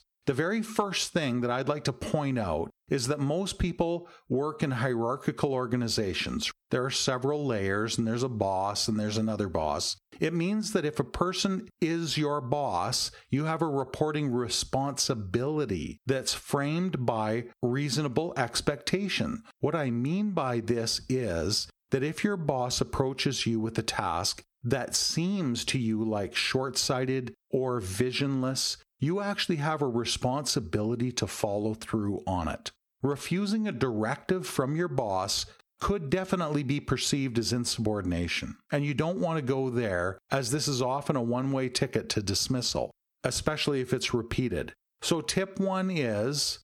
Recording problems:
squashed, flat; somewhat

